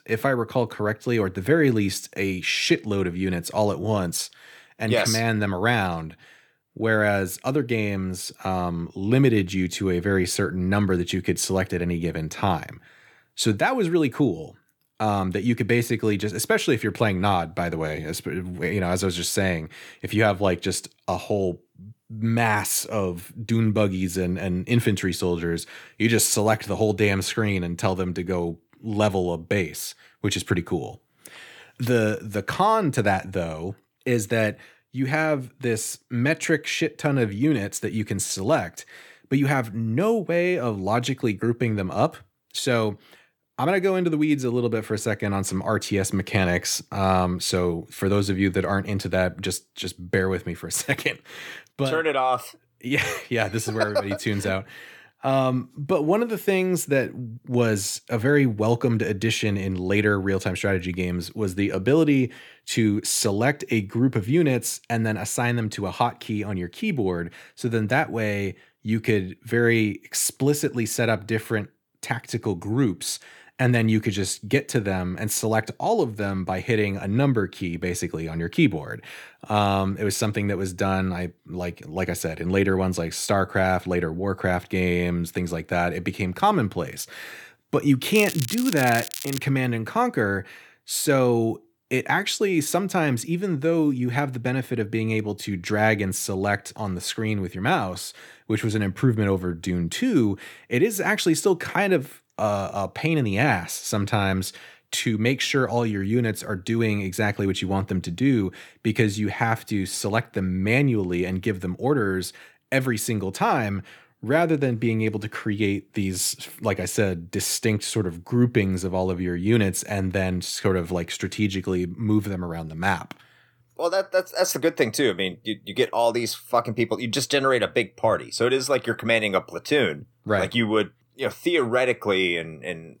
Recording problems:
crackling; loud; from 1:28 to 1:29; 8 dB below the speech

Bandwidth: 18.5 kHz